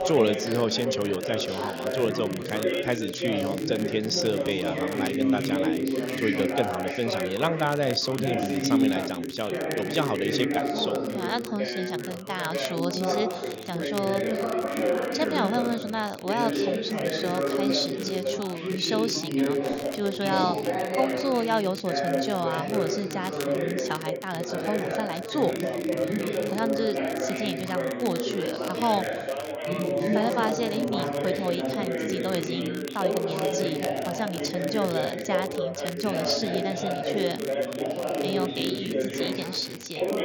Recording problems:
high frequencies cut off; noticeable; nothing above 7 kHz
chatter from many people; very loud; throughout; 1 dB above the speech
crackle, like an old record; noticeable; 15 dB below the speech

